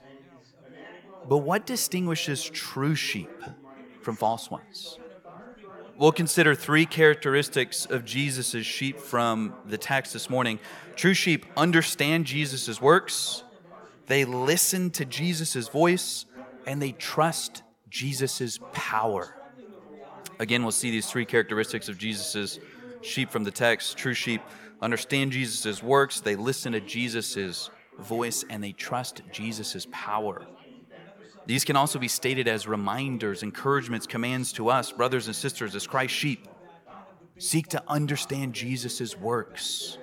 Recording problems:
background chatter; faint; throughout; 3 voices, 20 dB below the speech

